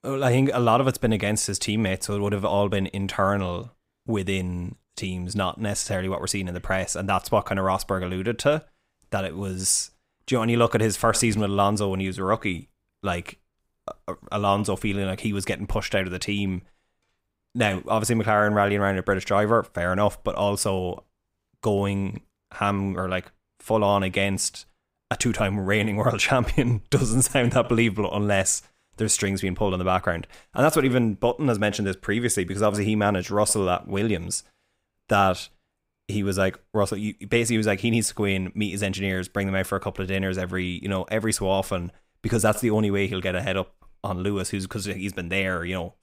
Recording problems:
none

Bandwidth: 15.5 kHz